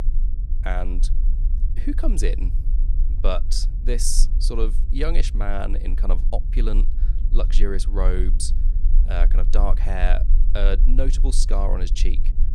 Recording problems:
low rumble; noticeable; throughout; 15 dB below the speech

